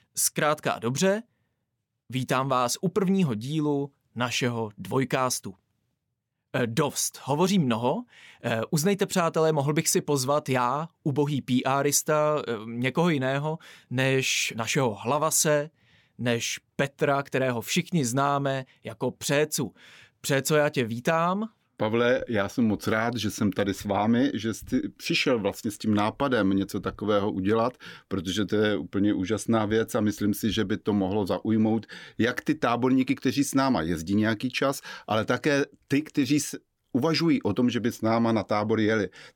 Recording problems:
none

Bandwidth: 17.5 kHz